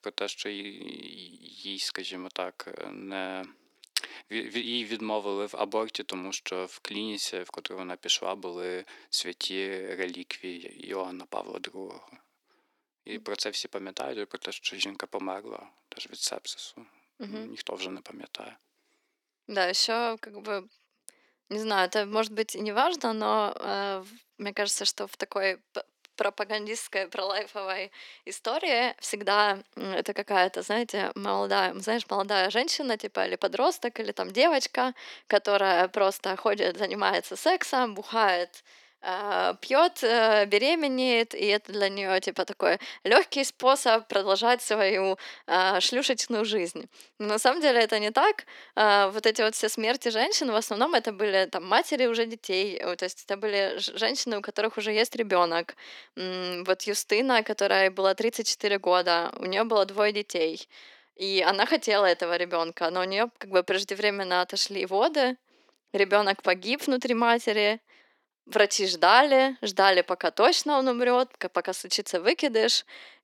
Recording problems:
thin; somewhat; fading below 350 Hz

